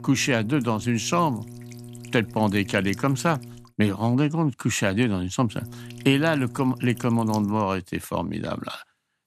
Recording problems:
electrical hum; noticeable; until 3.5 s and from 5.5 to 7.5 s; 60 Hz, 20 dB below the speech

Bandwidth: 14 kHz